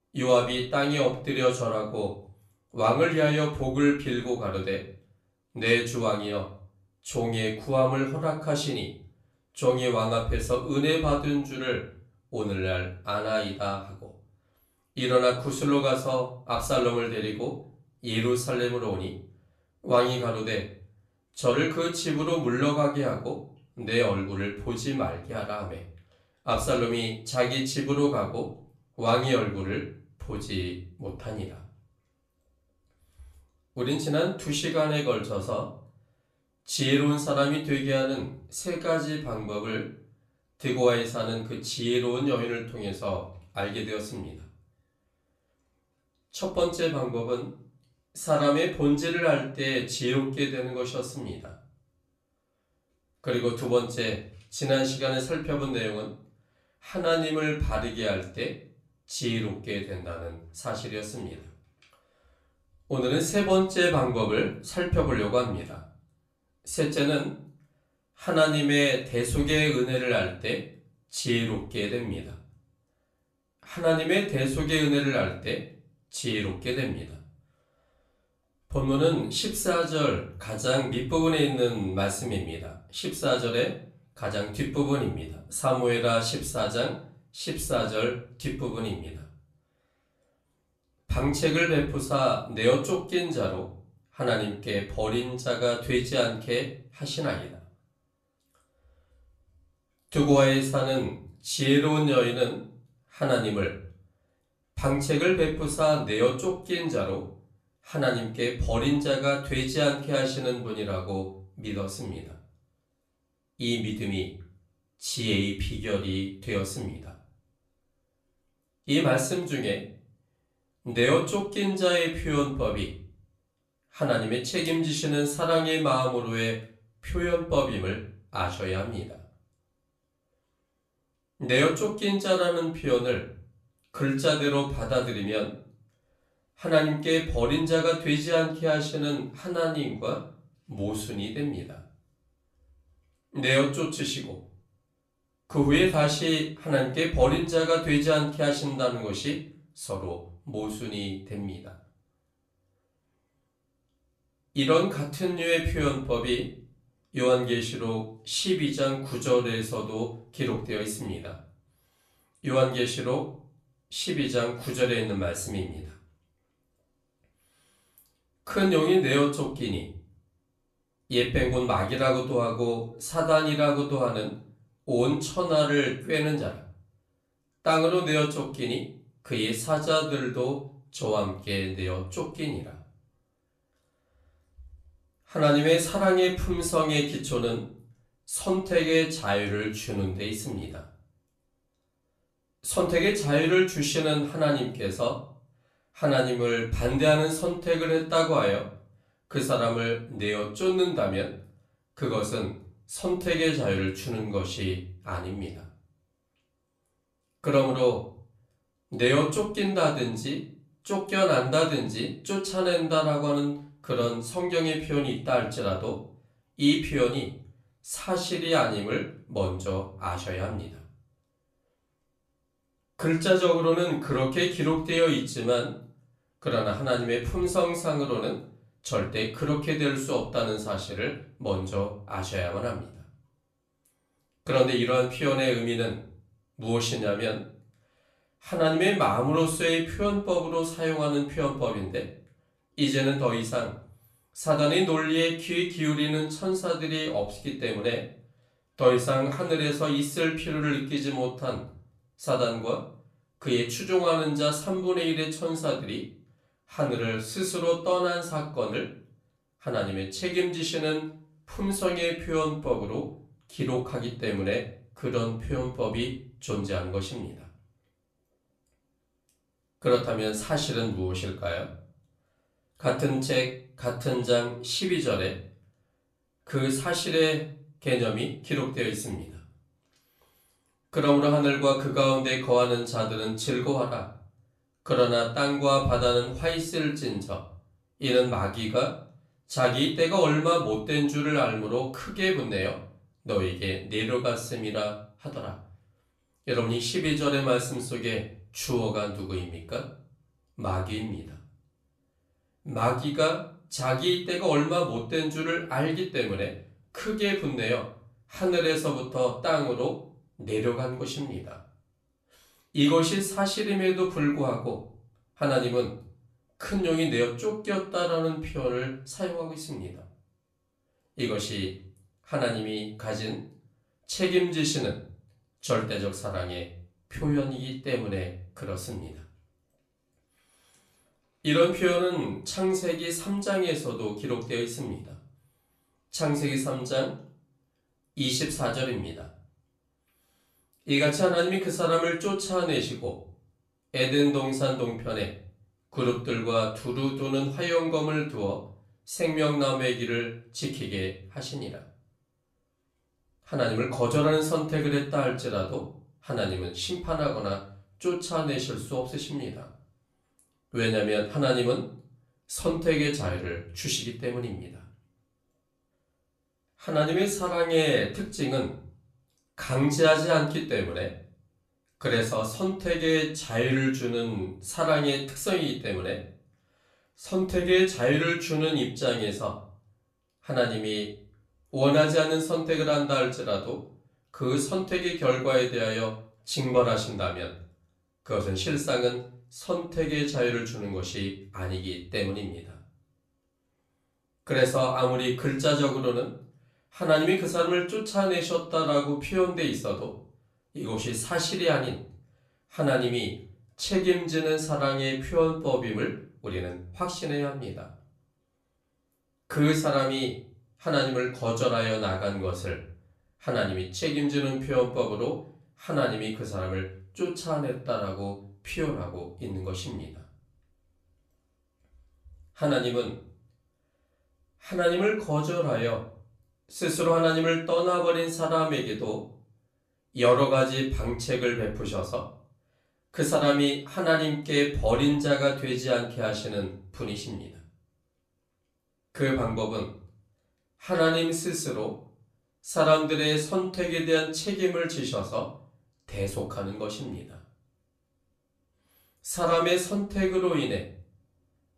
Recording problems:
off-mic speech; far
room echo; slight; dies away in 0.4 s

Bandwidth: 13.5 kHz